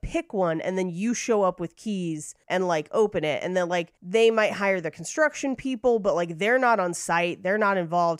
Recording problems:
none

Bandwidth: 15.5 kHz